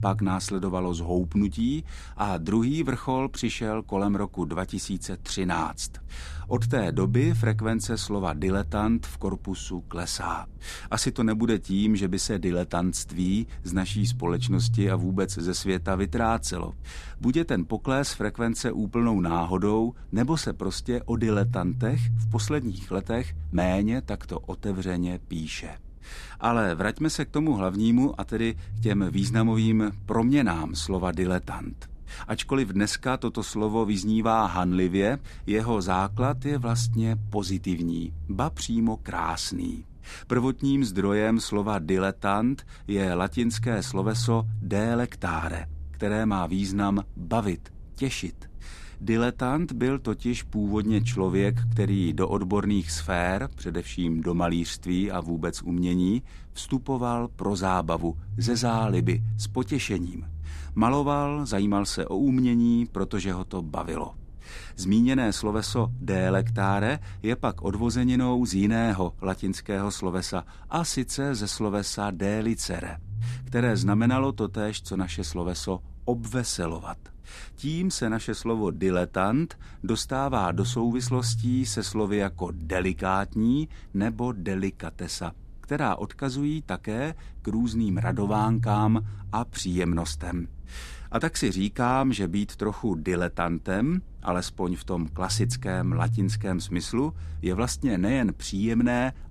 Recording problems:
low rumble; noticeable; throughout; 15 dB below the speech

